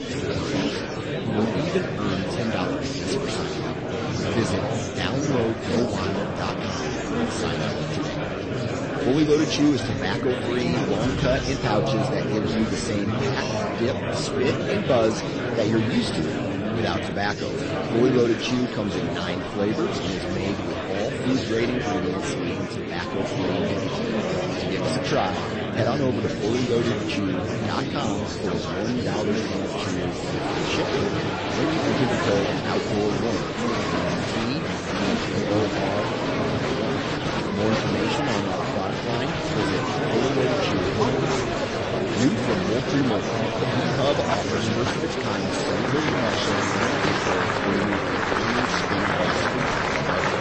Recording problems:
garbled, watery; slightly; nothing above 8 kHz
murmuring crowd; very loud; throughout; 2 dB above the speech

